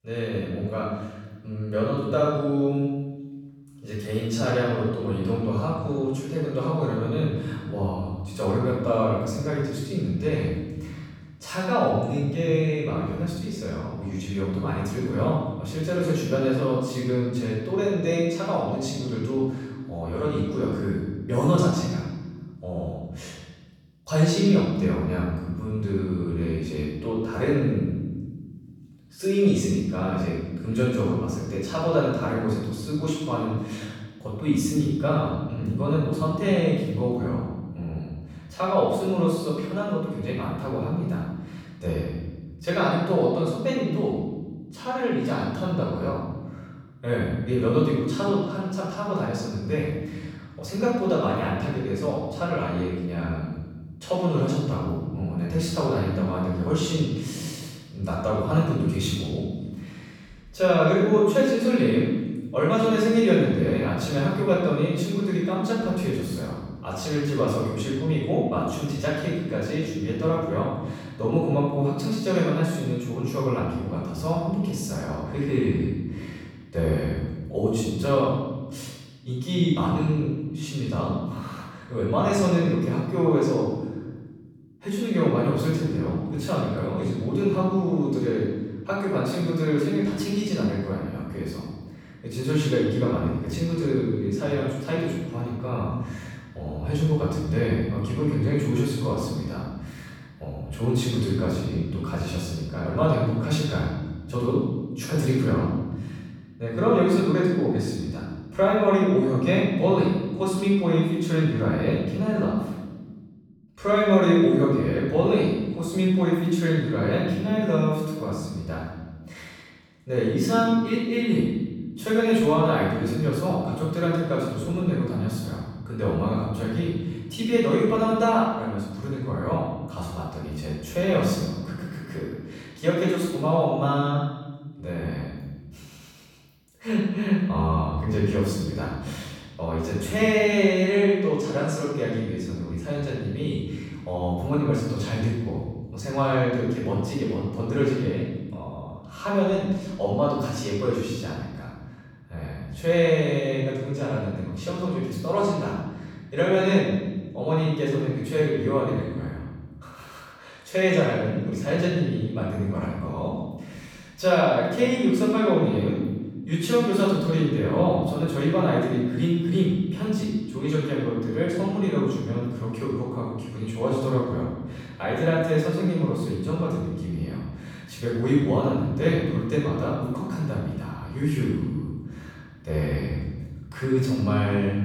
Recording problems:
room echo; strong; dies away in 1.4 s
off-mic speech; far

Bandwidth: 17.5 kHz